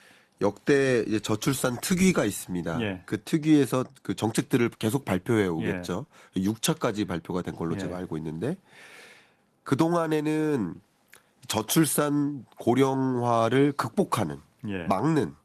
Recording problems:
garbled, watery; slightly; nothing above 13.5 kHz

